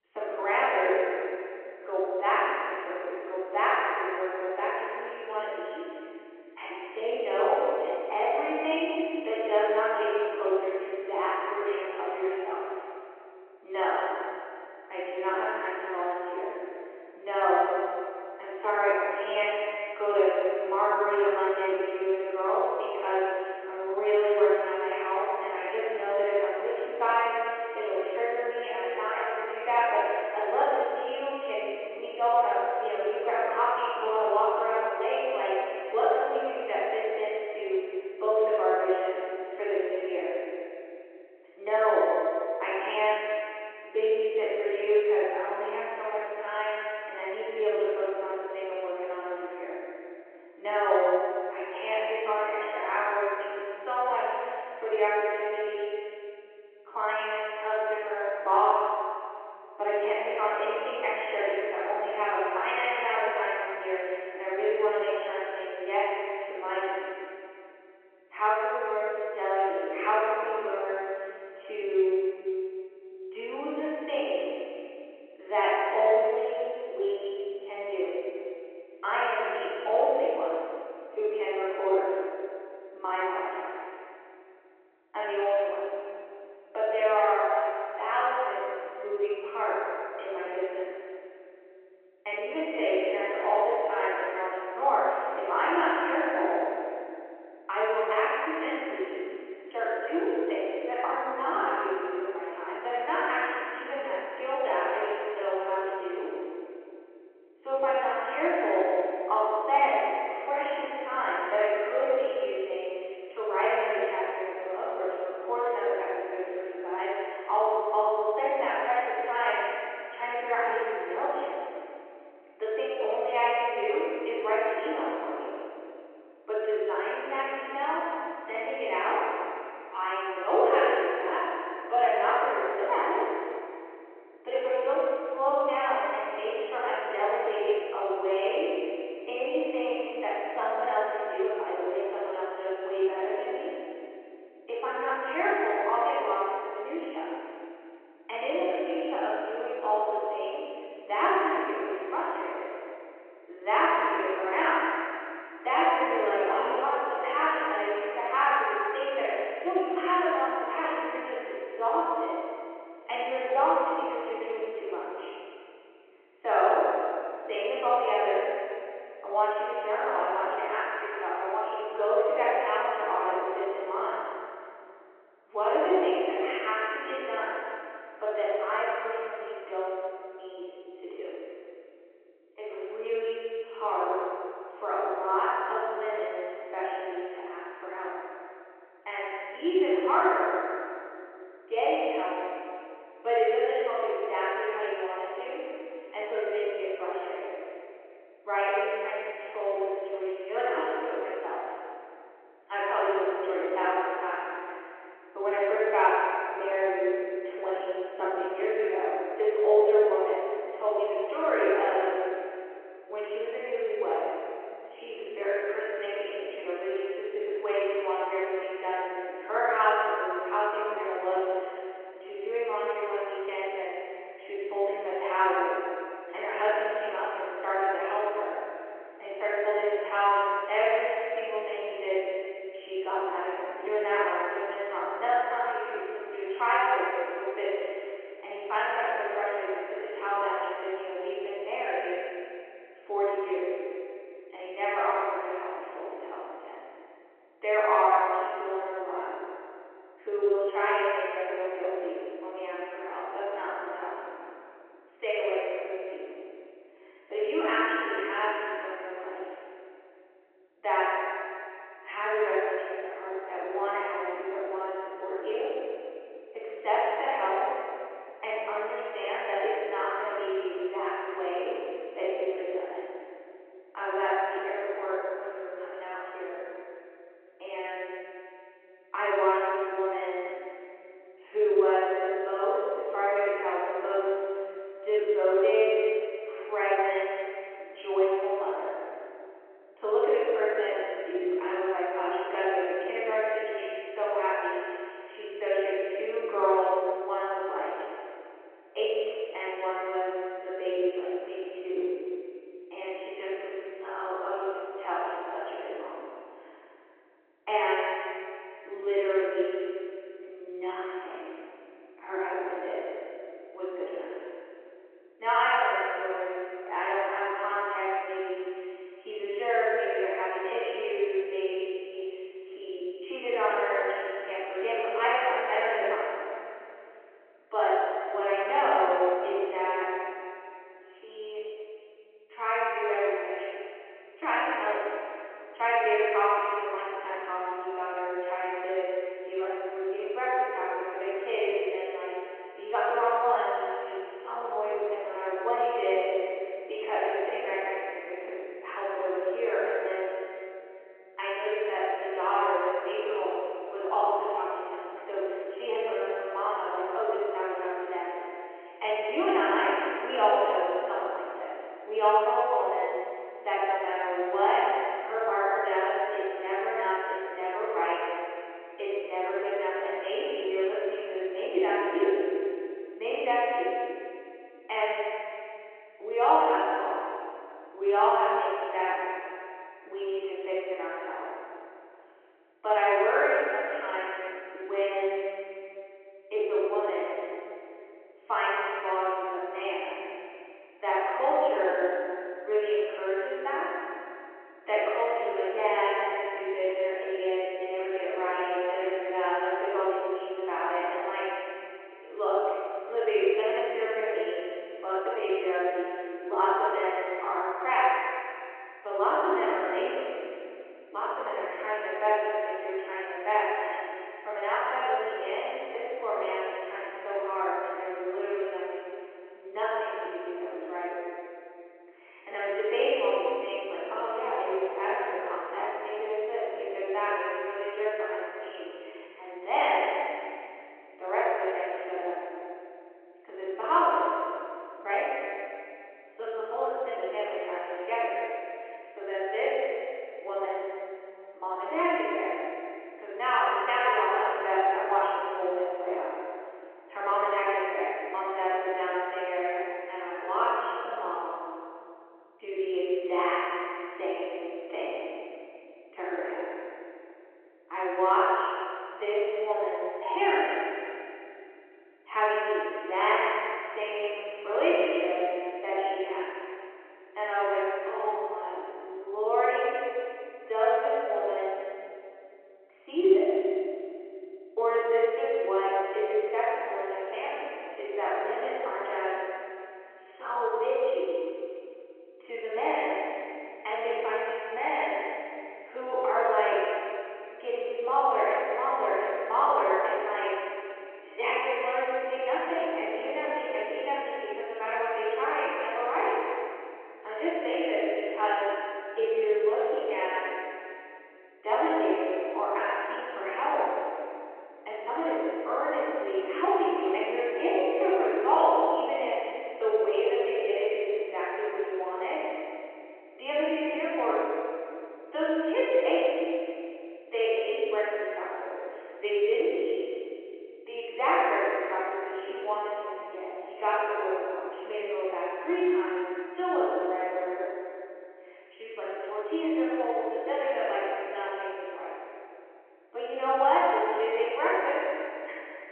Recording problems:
room echo; strong; dies away in 3 s
off-mic speech; far
muffled; very; fading above 3 kHz
phone-call audio

